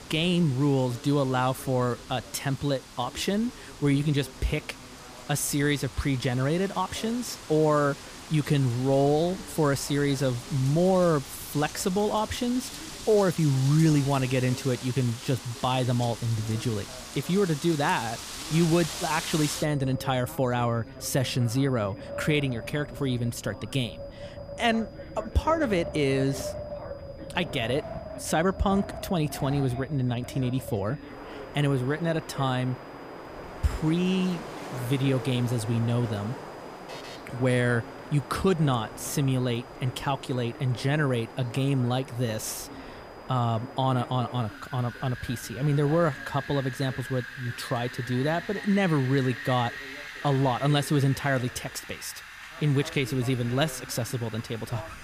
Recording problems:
wind in the background; noticeable; throughout; 15 dB below the speech
high-pitched whine; faint; throughout; 5 kHz, 35 dB below the speech
background chatter; faint; throughout; 2 voices, 20 dB below the speech
alarm; faint; at 37 s; peak 15 dB below the speech

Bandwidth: 15 kHz